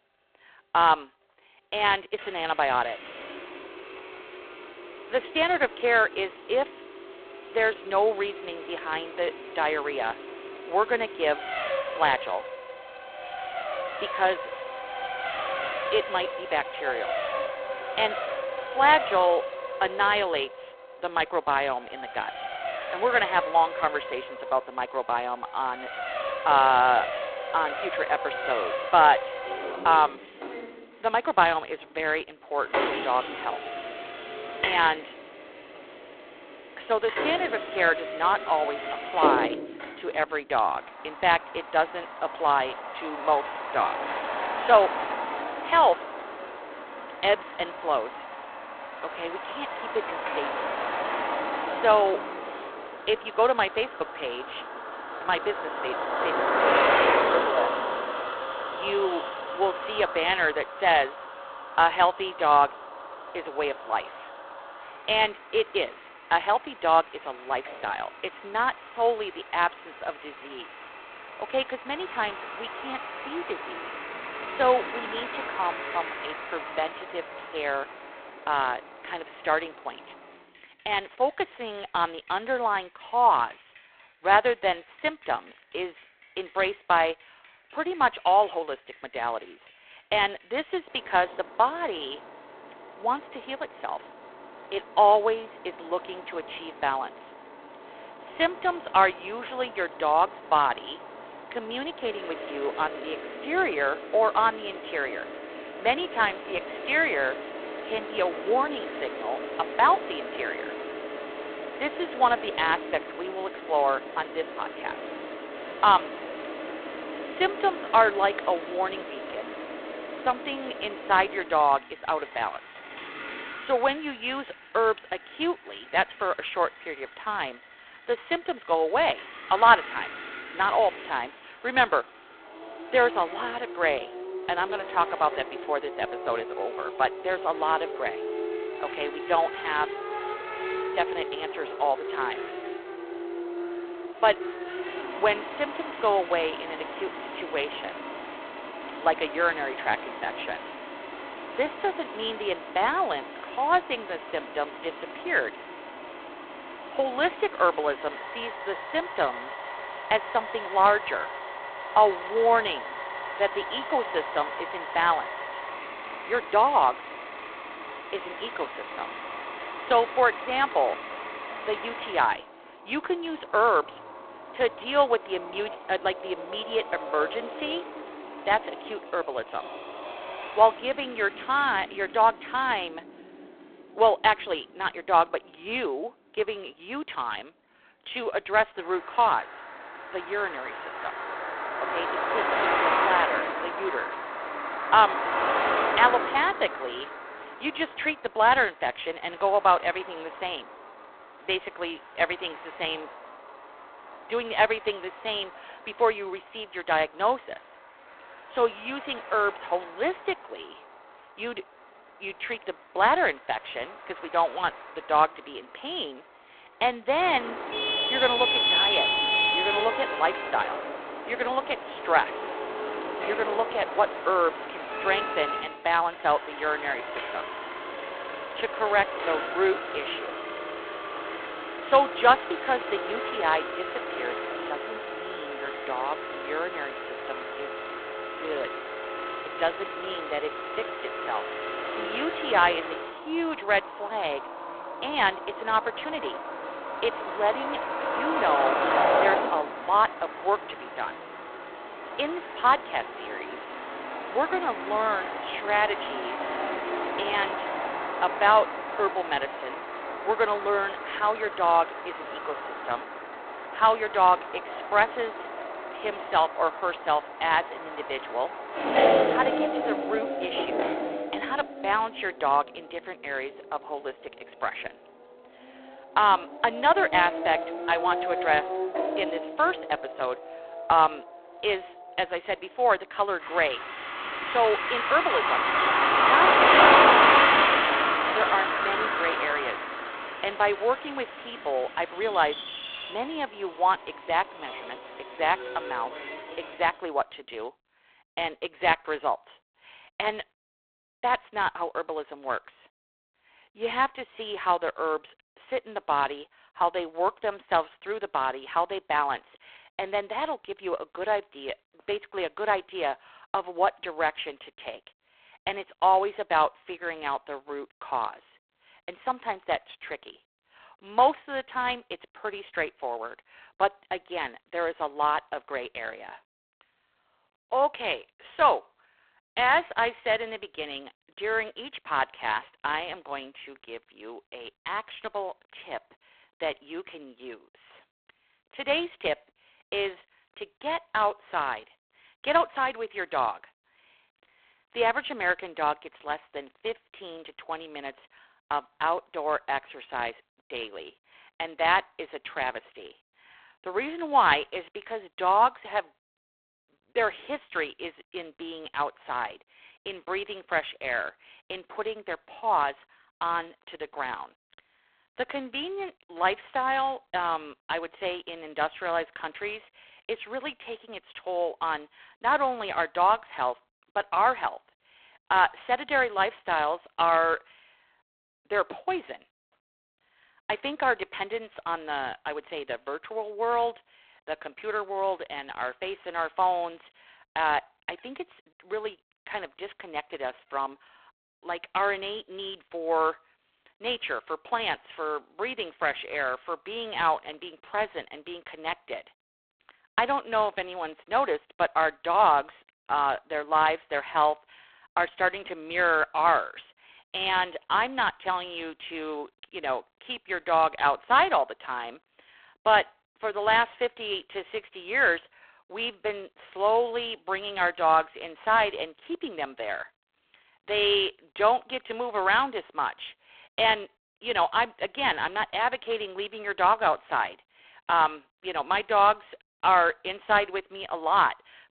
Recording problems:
phone-call audio; poor line
traffic noise; loud; until 4:57; 4 dB below the speech

